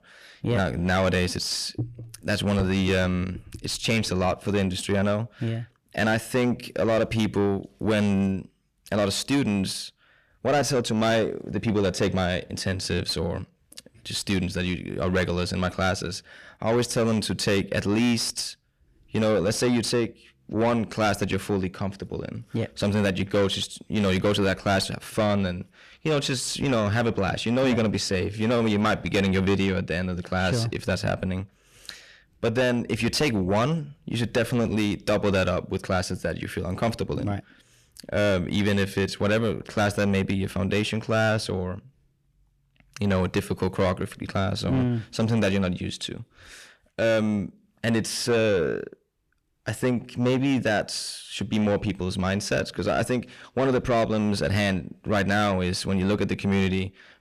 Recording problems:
distortion; heavy; 7 dB below the speech

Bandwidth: 14.5 kHz